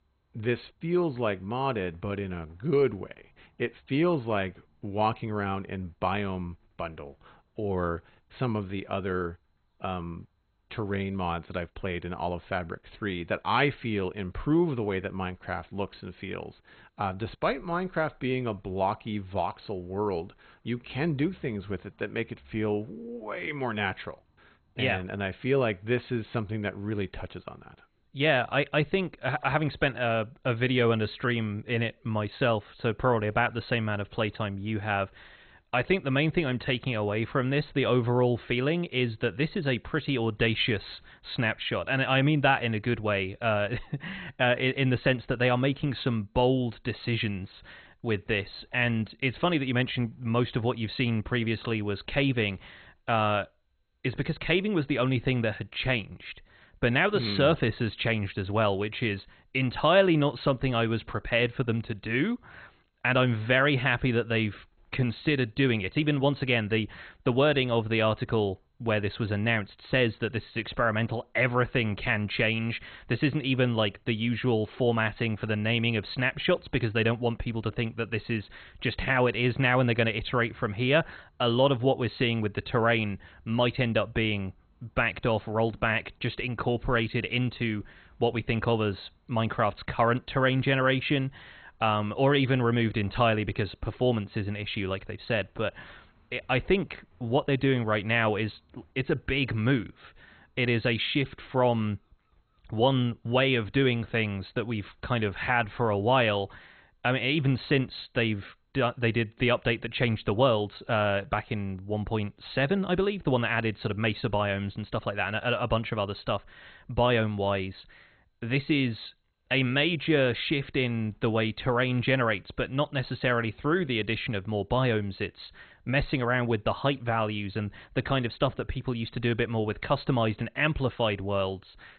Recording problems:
garbled, watery; badly; nothing above 4 kHz

